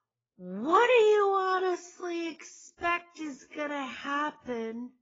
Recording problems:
garbled, watery; badly; nothing above 7.5 kHz
wrong speed, natural pitch; too slow; 0.5 times normal speed

